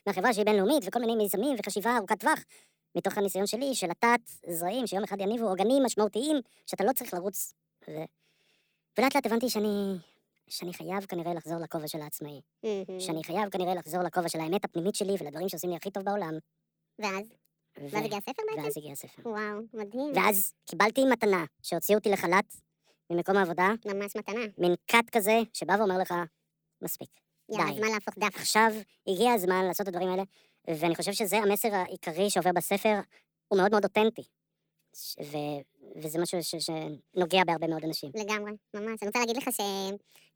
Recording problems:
wrong speed and pitch; too fast and too high; 1.6 times normal speed

